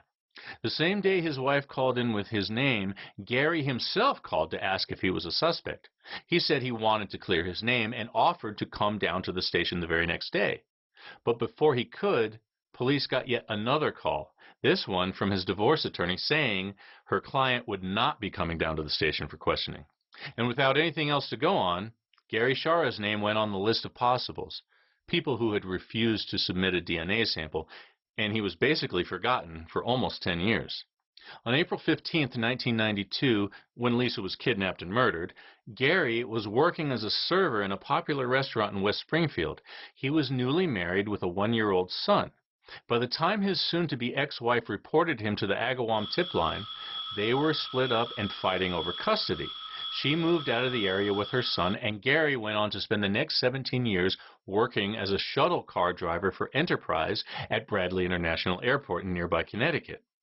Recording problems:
garbled, watery; badly; nothing above 5.5 kHz
phone ringing; noticeable; from 46 to 52 s; peak 6 dB below the speech

